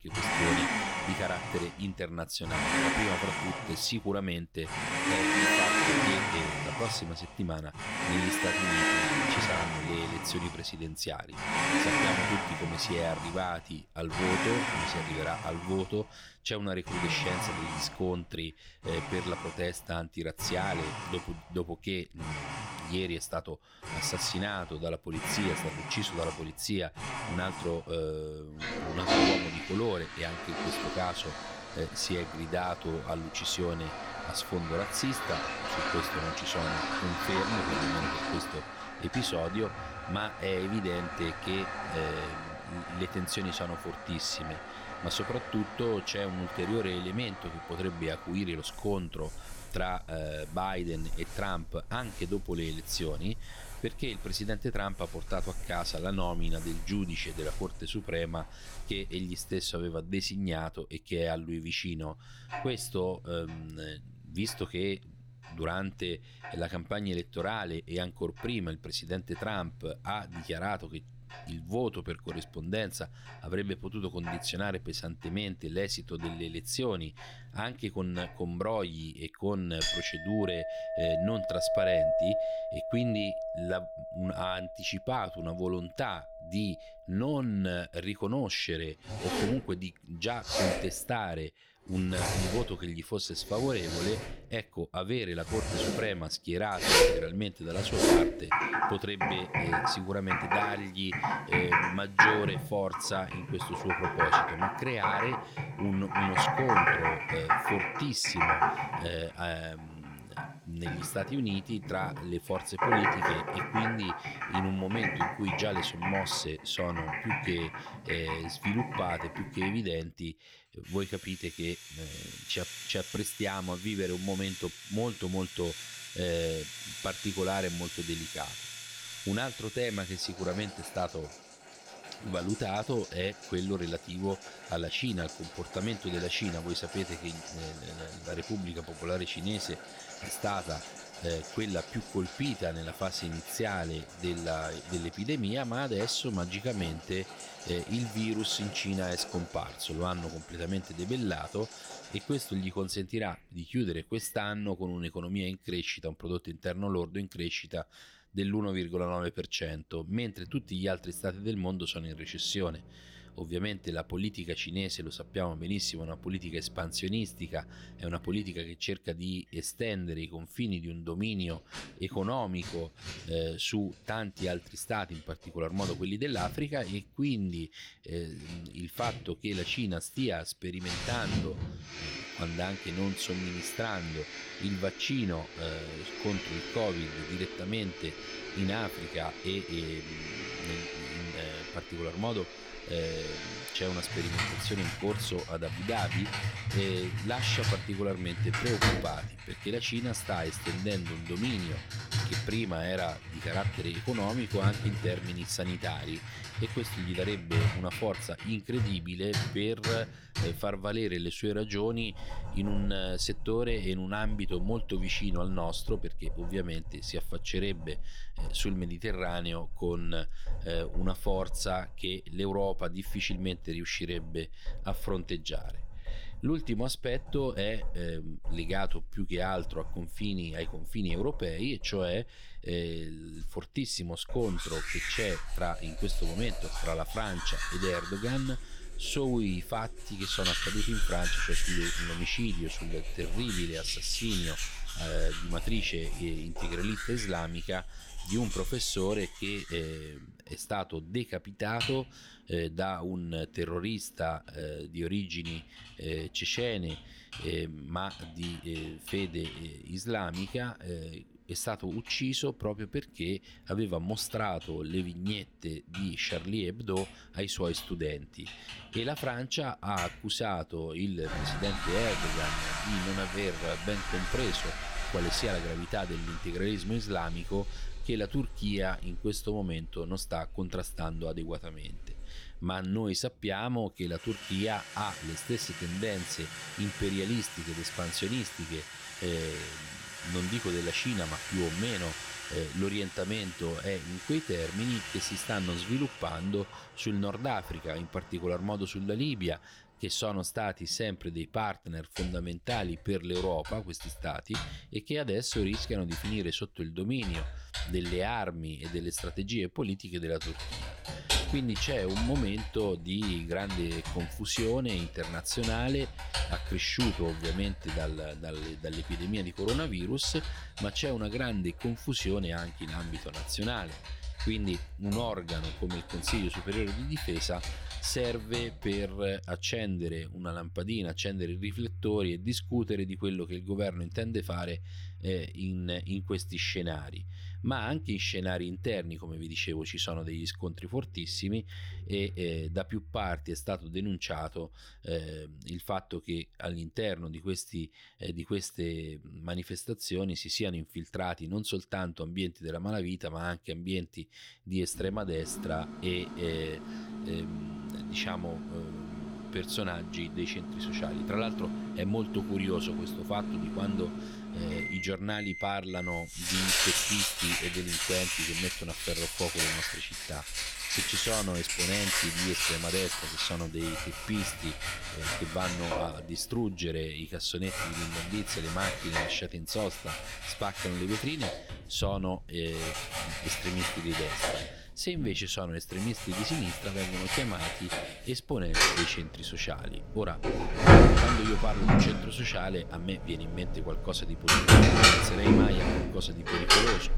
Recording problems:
household noises; very loud; throughout; 1 dB above the speech

